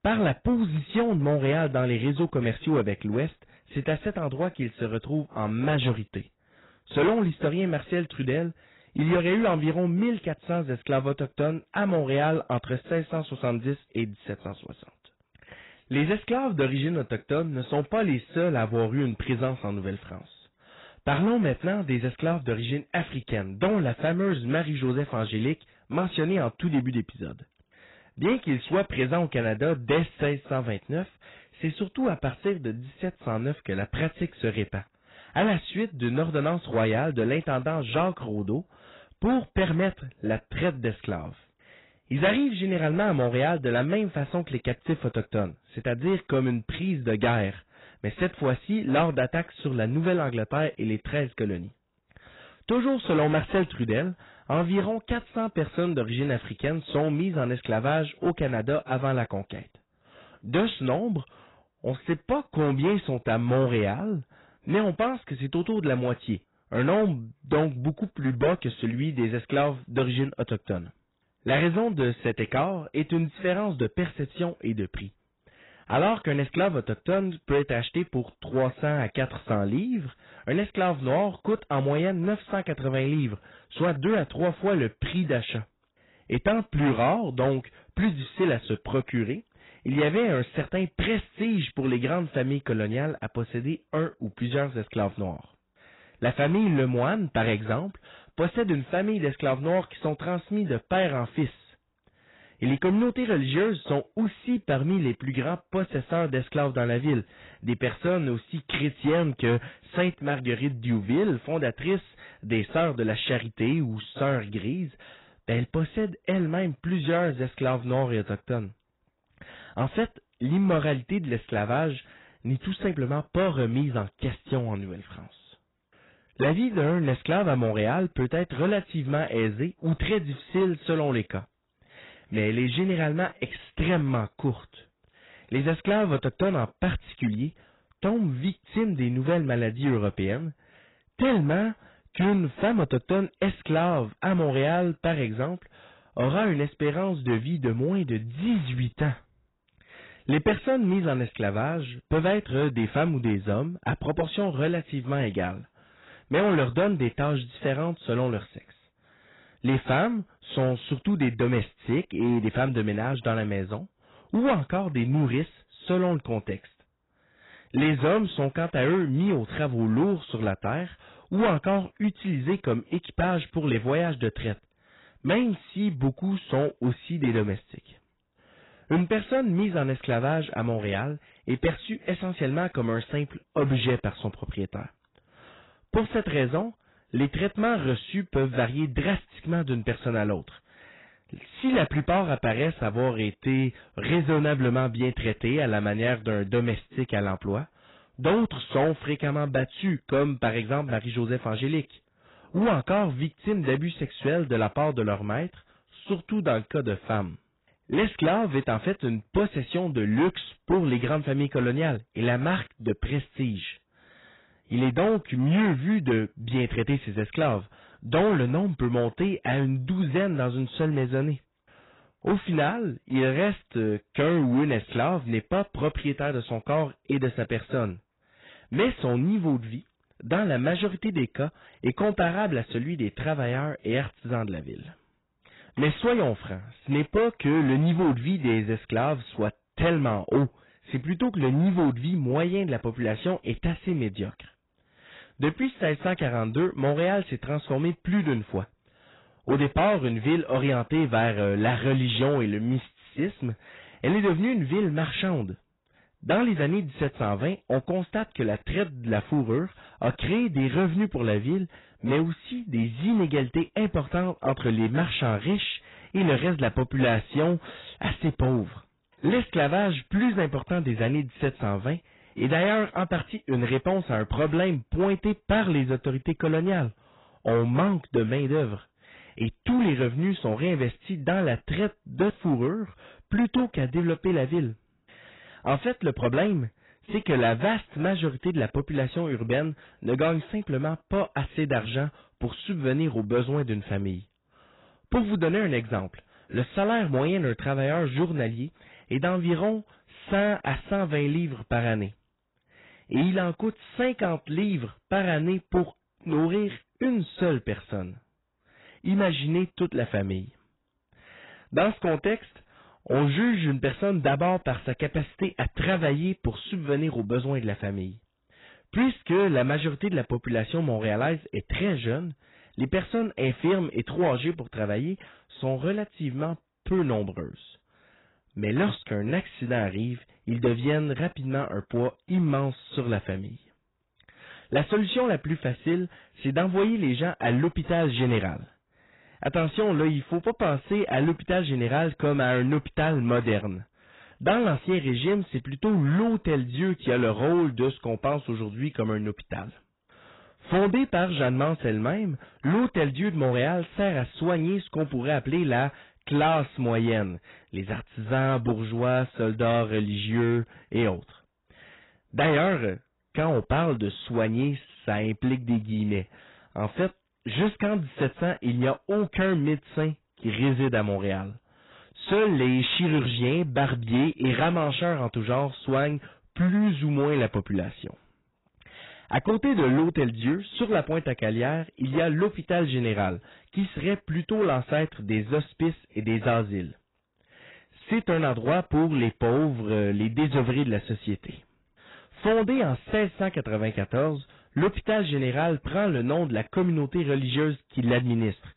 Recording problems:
garbled, watery; badly; nothing above 4 kHz
distortion; slight; 6% of the sound clipped

